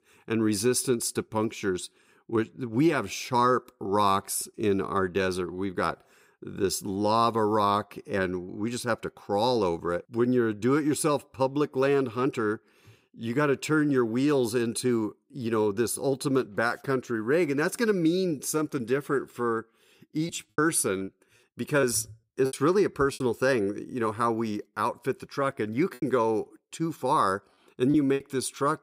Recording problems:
choppy; very; from 20 to 23 s and from 26 to 28 s; 13% of the speech affected

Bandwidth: 15.5 kHz